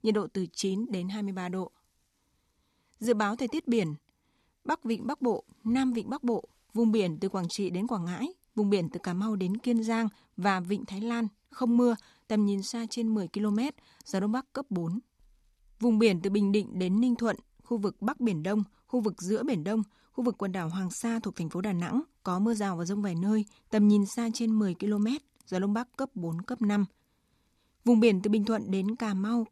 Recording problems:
none

